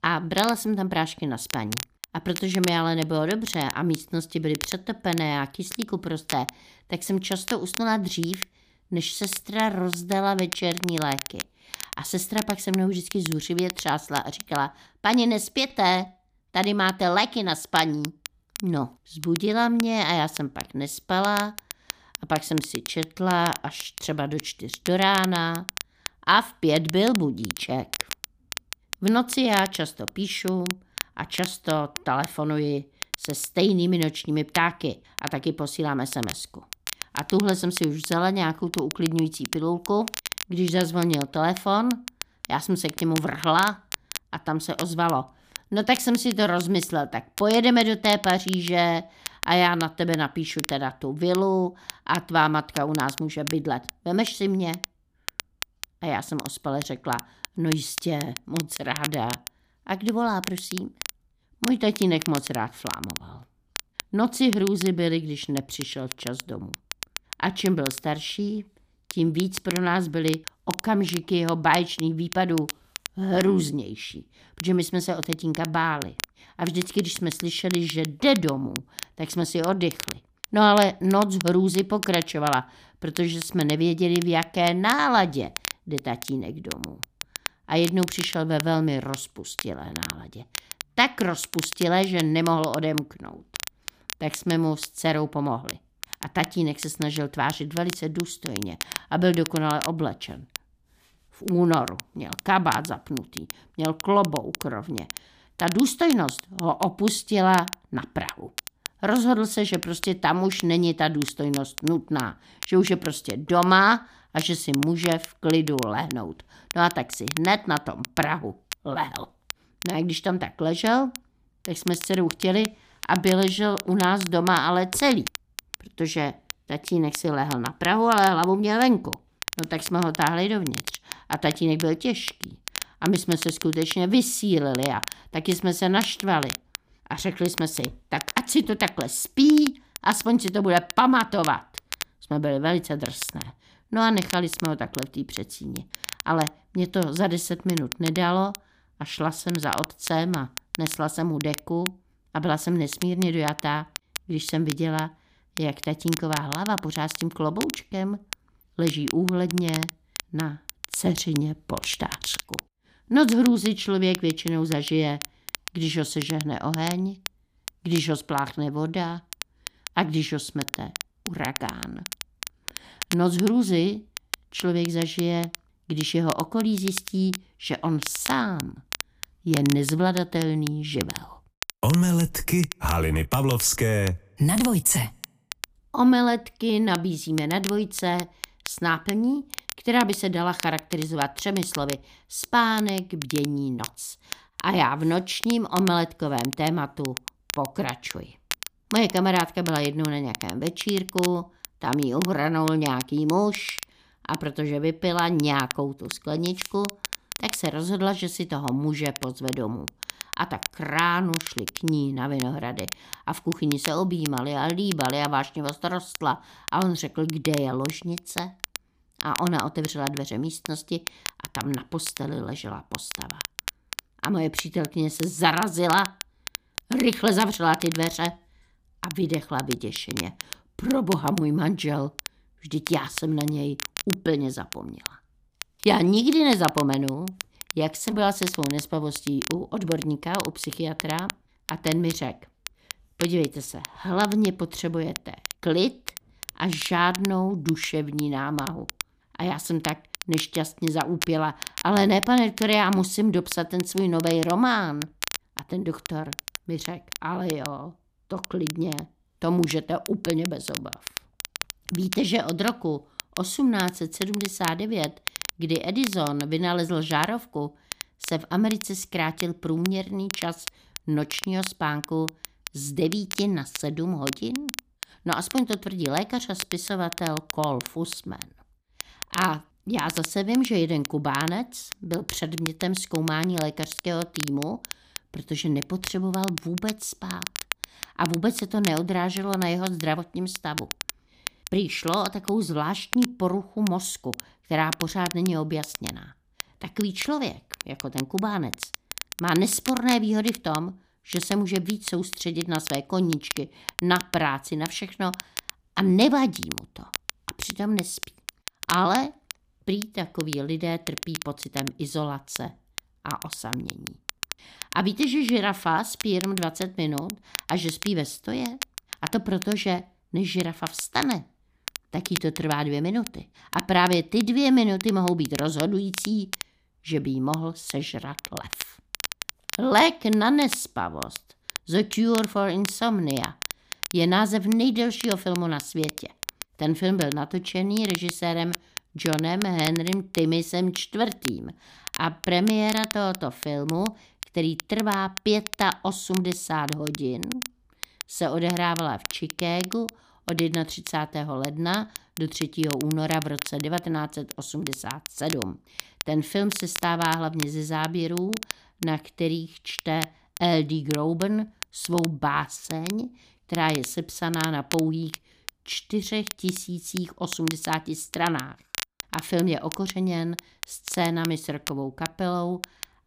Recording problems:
crackle, like an old record; noticeable; 10 dB below the speech

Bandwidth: 15 kHz